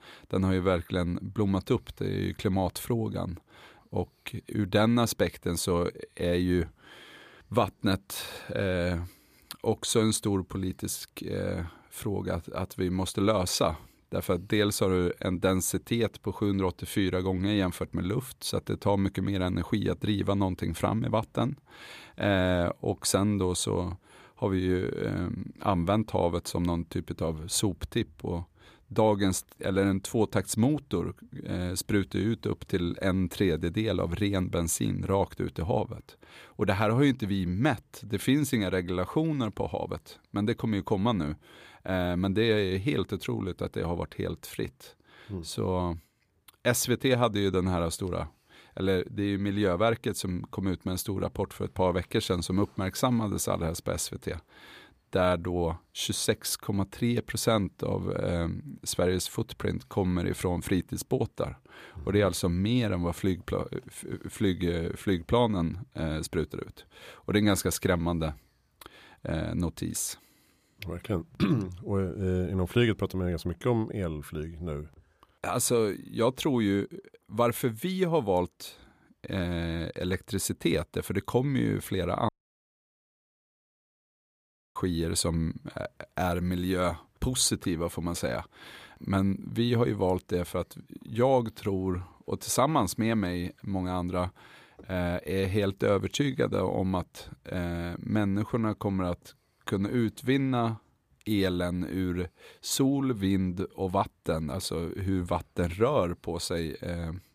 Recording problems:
audio cutting out; at 1:22 for 2.5 s

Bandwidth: 15 kHz